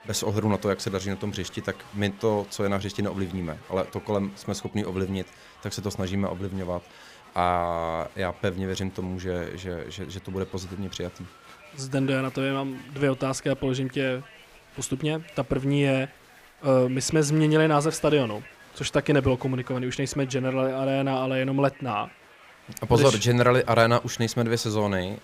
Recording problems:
crowd noise; faint; throughout; 20 dB below the speech

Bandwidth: 15 kHz